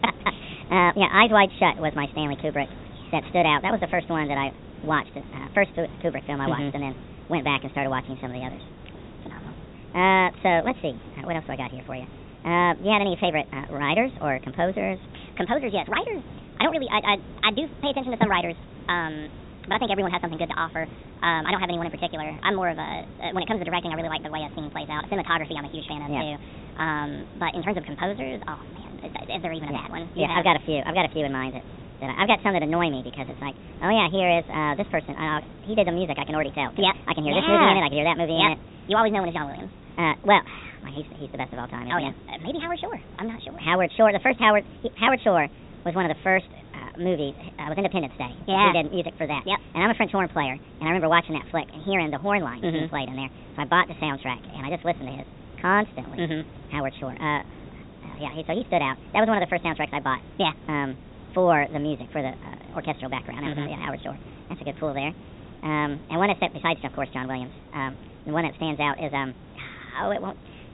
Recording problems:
high frequencies cut off; severe; nothing above 4 kHz
wrong speed and pitch; too fast and too high; 1.5 times normal speed
hiss; noticeable; throughout; 20 dB below the speech

